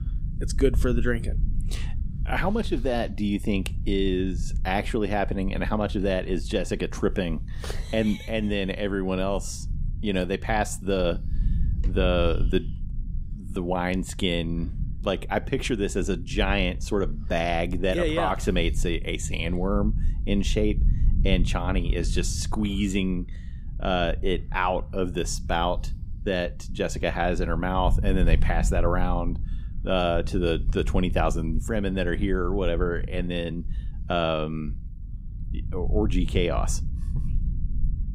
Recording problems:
low rumble; noticeable; throughout; 20 dB below the speech

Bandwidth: 15.5 kHz